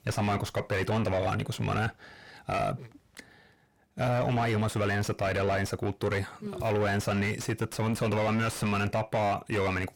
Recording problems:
distortion; heavy; 6 dB below the speech

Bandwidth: 17 kHz